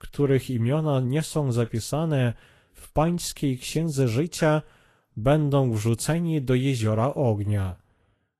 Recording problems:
garbled, watery; slightly; nothing above 12.5 kHz

